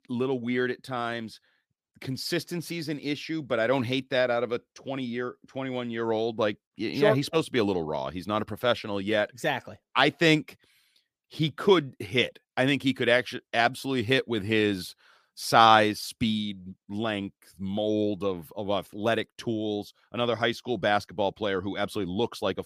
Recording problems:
none

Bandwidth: 15 kHz